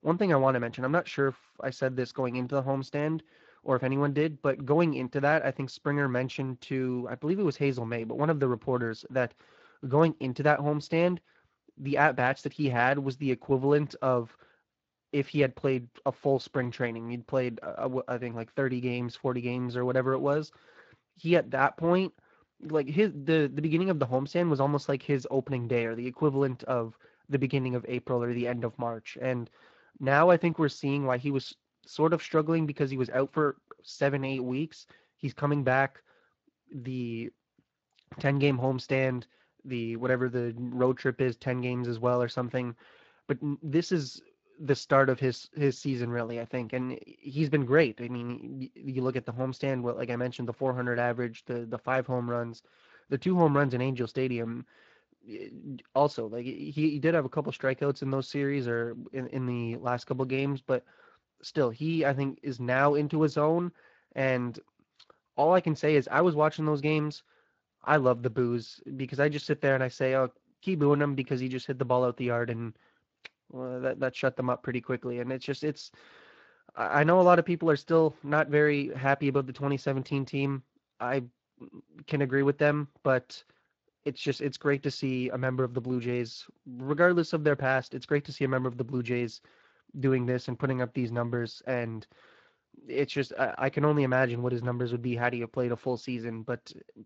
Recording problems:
garbled, watery; slightly; nothing above 7 kHz
high frequencies cut off; slight

